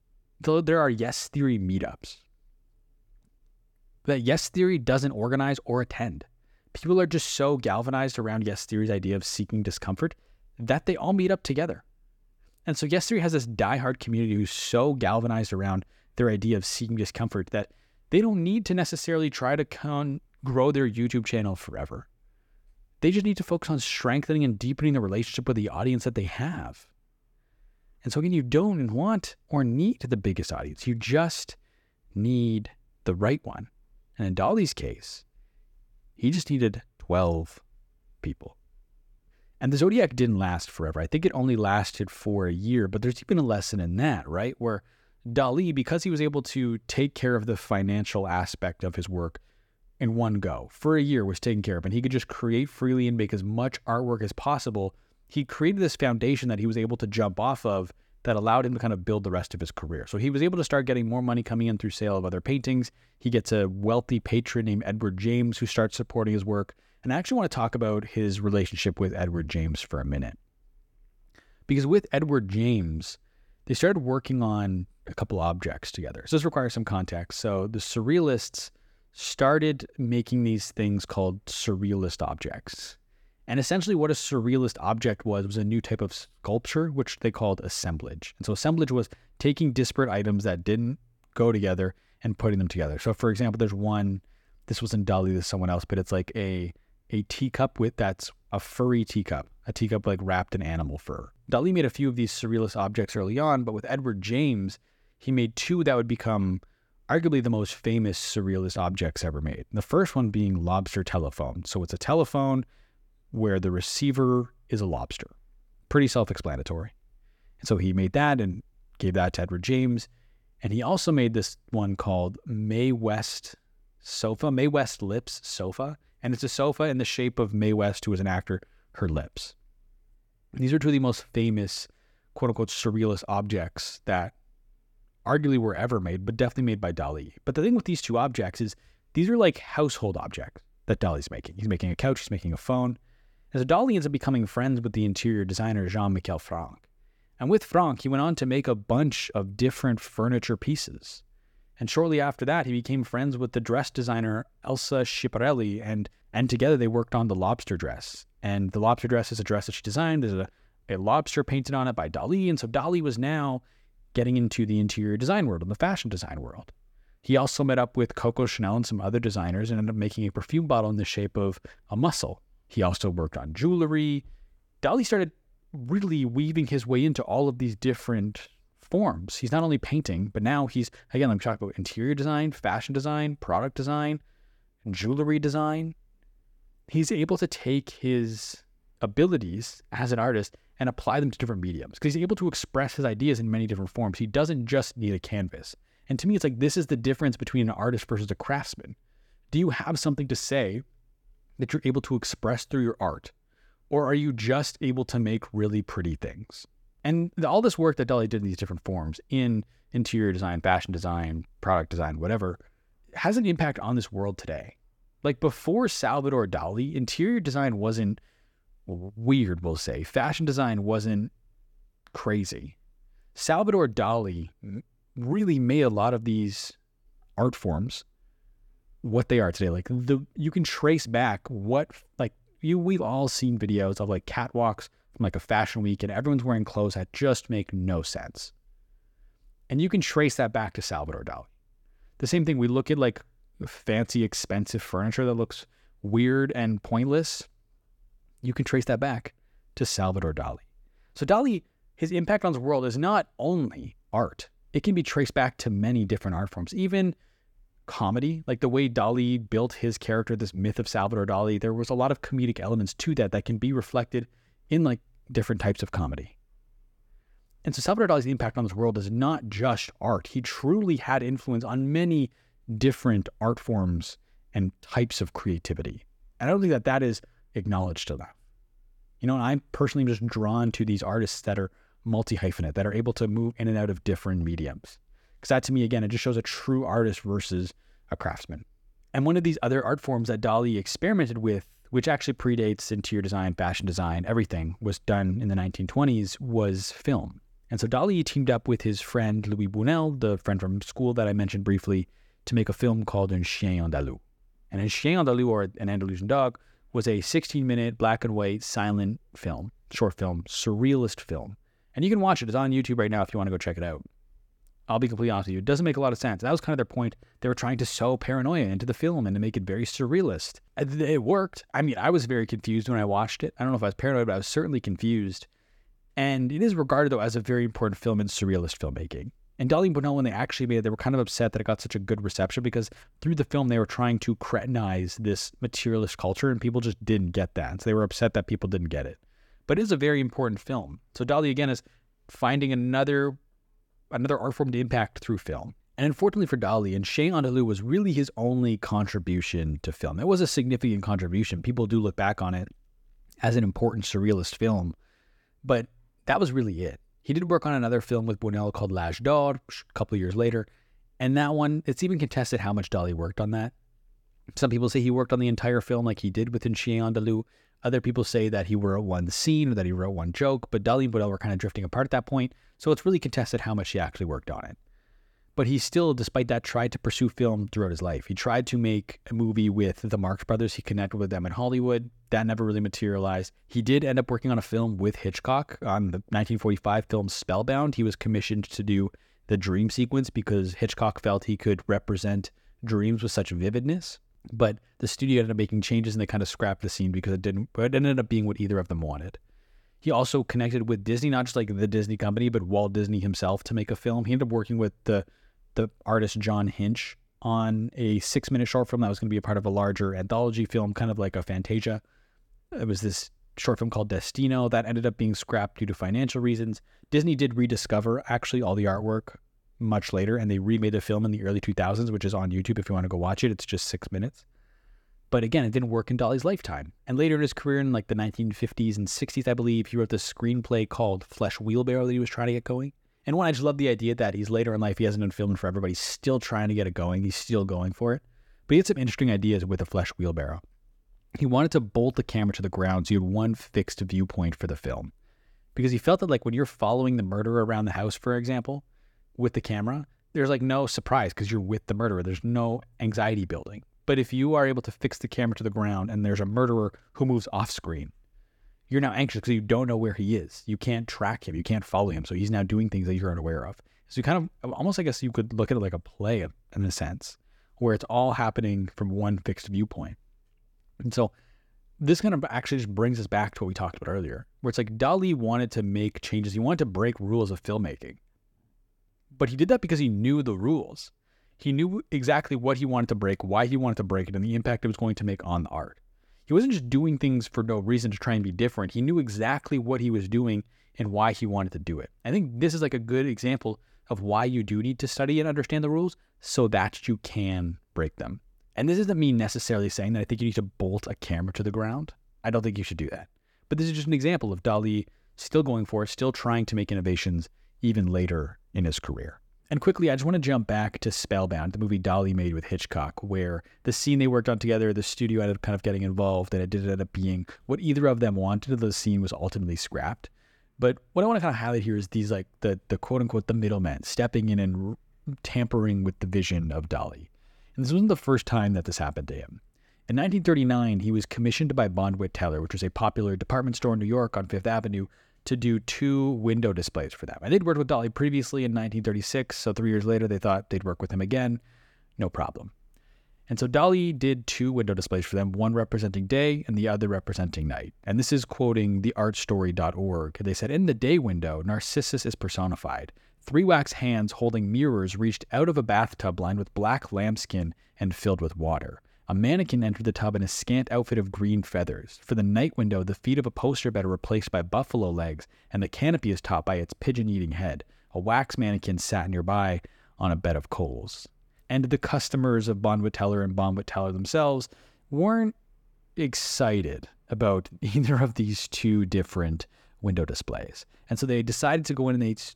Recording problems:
none

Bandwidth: 18 kHz